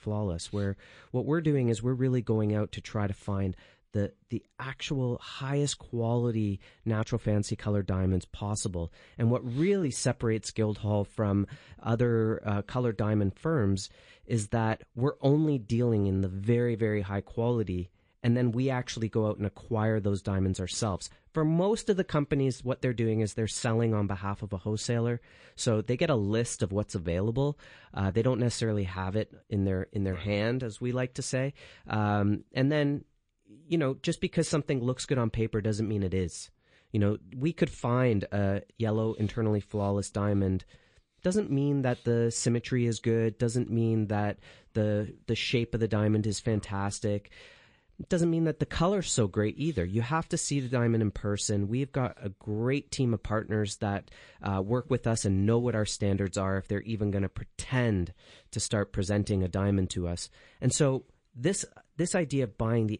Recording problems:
garbled, watery; slightly; nothing above 8.5 kHz

